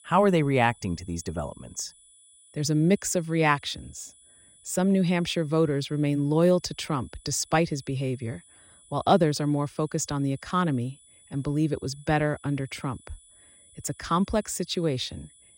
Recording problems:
high-pitched whine; faint; throughout; 10 kHz, 25 dB below the speech

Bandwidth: 16 kHz